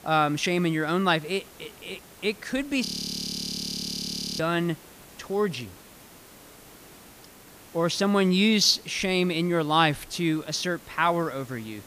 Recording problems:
hiss; faint; throughout; 25 dB below the speech
audio freezing; at 3 s for 1.5 s

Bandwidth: 15 kHz